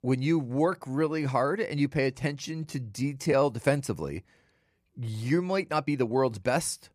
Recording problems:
uneven, jittery; strongly; from 1 to 6 s

